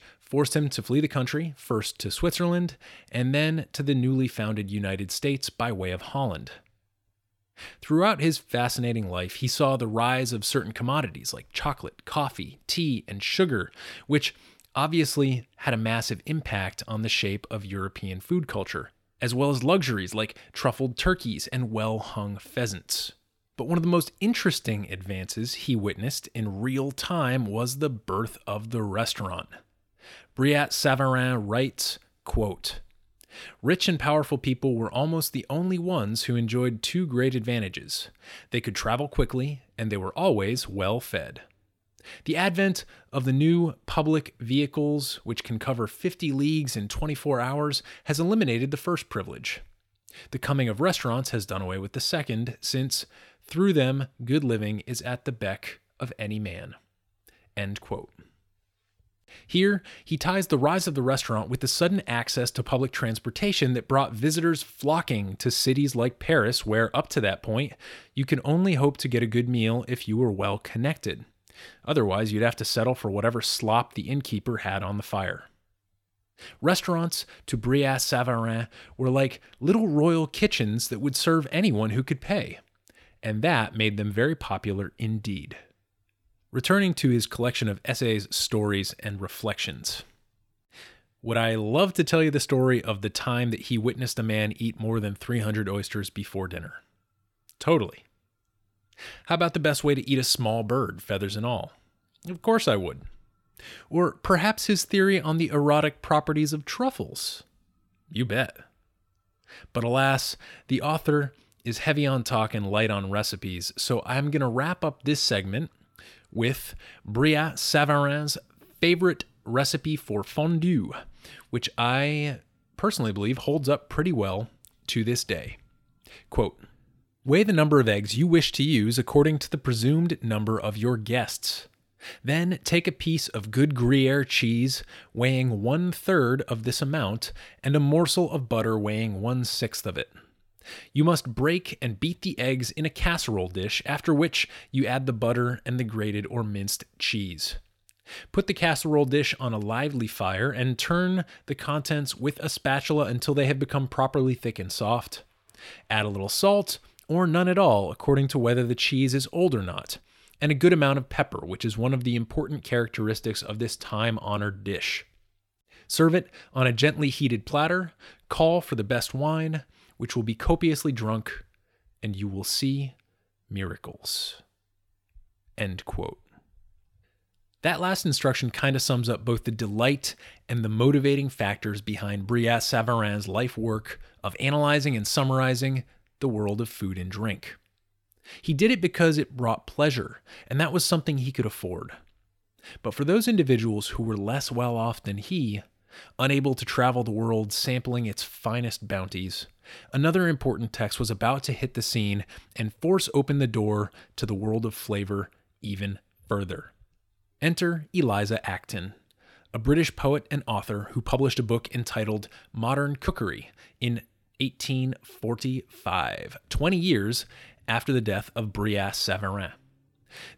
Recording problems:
none

